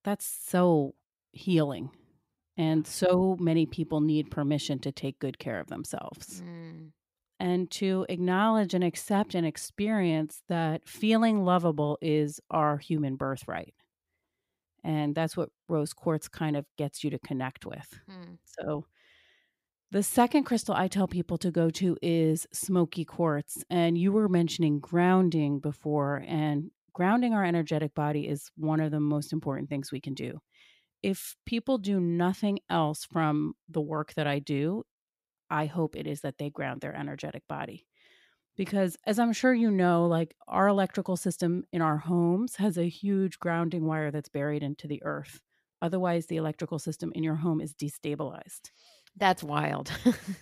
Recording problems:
none

